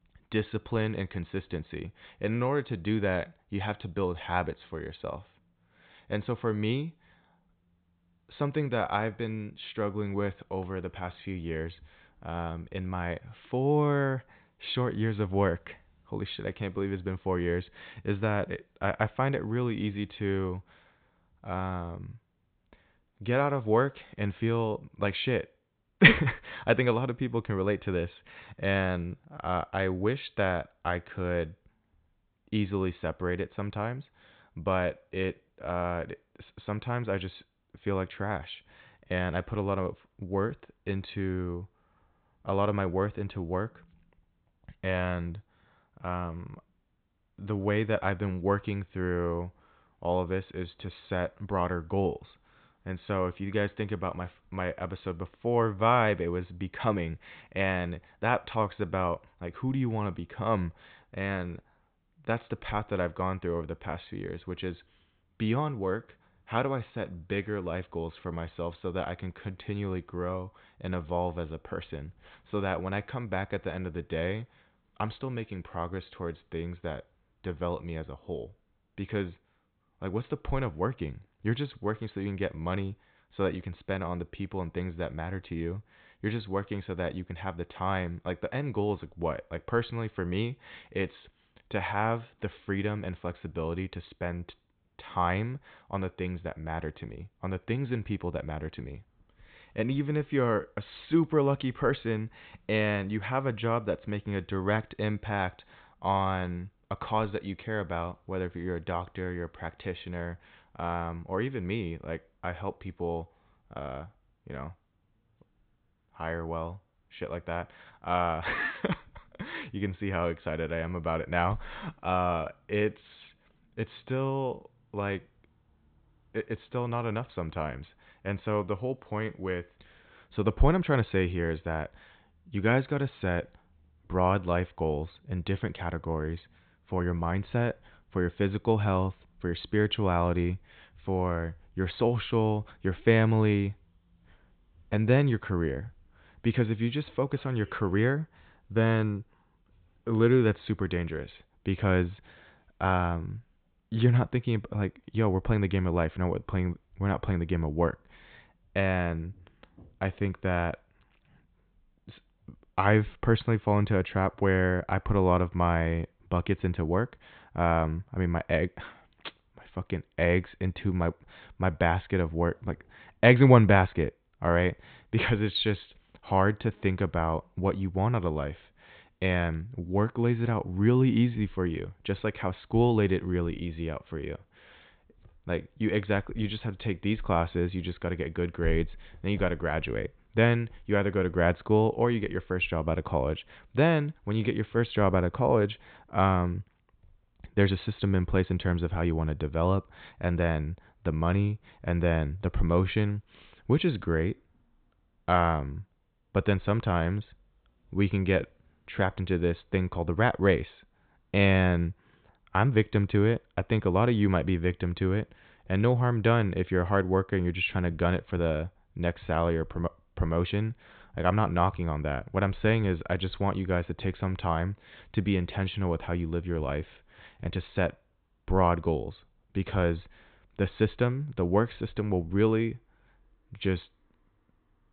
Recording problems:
high frequencies cut off; severe; nothing above 4 kHz

